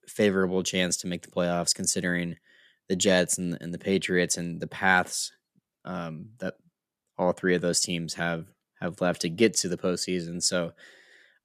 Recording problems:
none

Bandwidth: 14.5 kHz